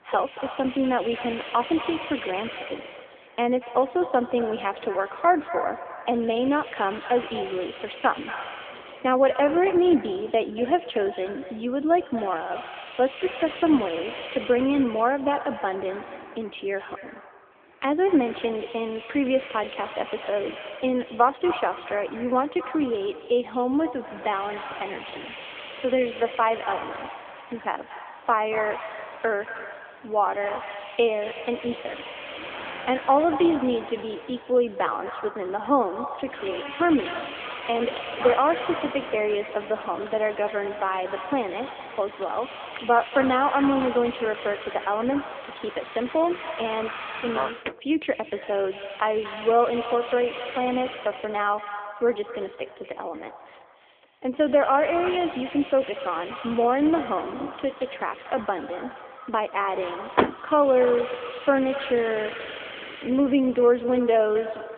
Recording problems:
echo of what is said; strong; throughout; 230 ms later, 10 dB below the speech
phone-call audio; nothing above 3.5 kHz
traffic noise; noticeable; throughout; 15 dB below the speech
hiss; noticeable; throughout; 15 dB below the speech

